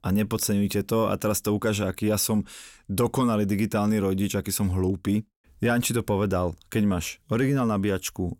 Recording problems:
none

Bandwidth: 16.5 kHz